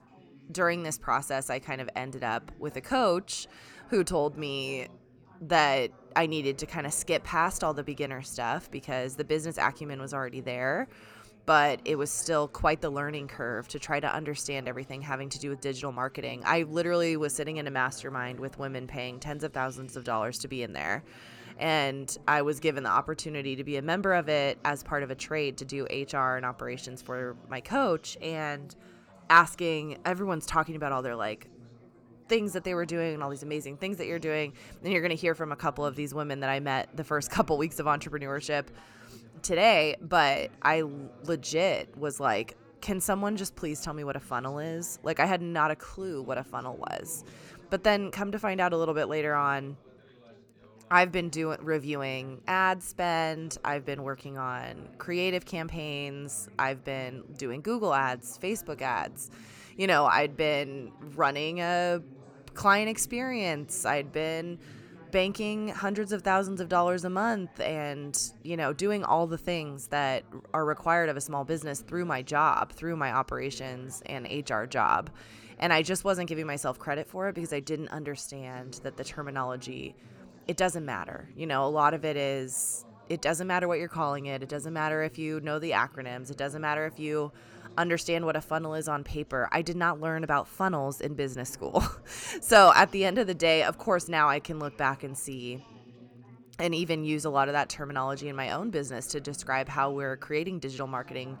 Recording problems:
background chatter; faint; throughout; 4 voices, 25 dB below the speech

